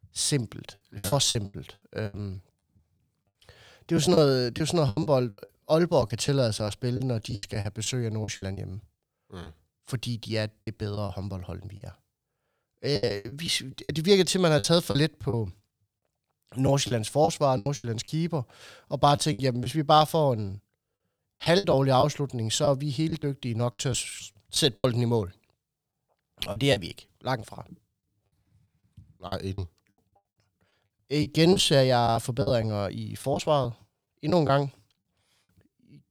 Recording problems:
choppy; very; 11% of the speech affected

